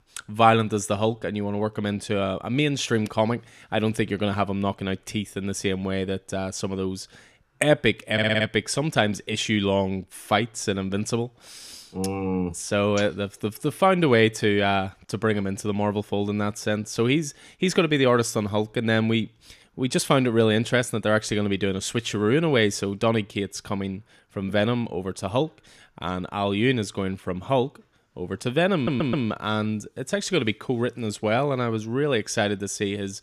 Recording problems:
audio stuttering; at 8 s and at 29 s

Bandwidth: 14.5 kHz